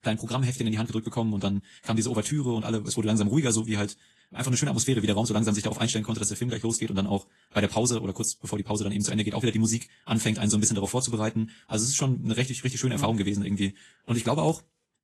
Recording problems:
wrong speed, natural pitch; too fast; 1.6 times normal speed
garbled, watery; slightly; nothing above 12 kHz

